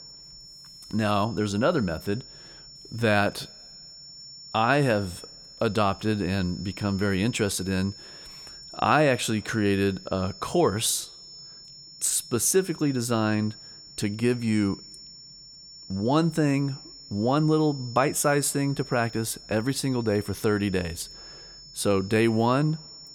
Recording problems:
high-pitched whine; noticeable; throughout; 5.5 kHz, 15 dB below the speech

